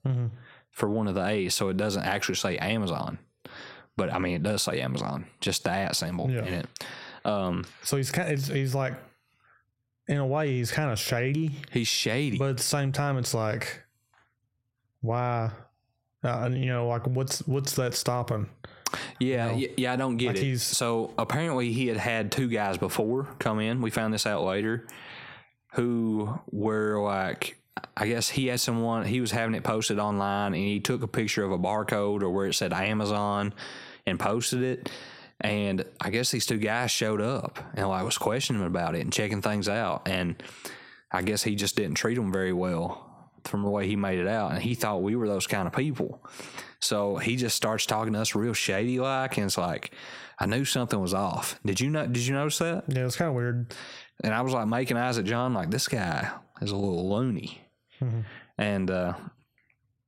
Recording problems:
squashed, flat; heavily

